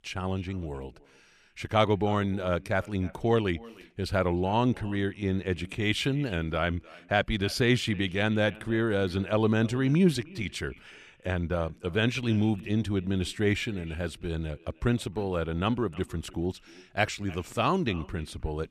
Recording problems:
echo of what is said; faint; throughout; 310 ms later, 20 dB below the speech

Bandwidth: 14.5 kHz